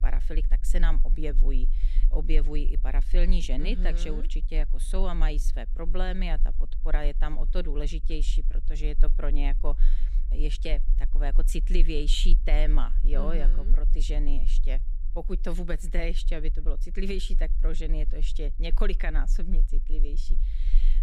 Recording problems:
low rumble; noticeable; throughout; 20 dB below the speech

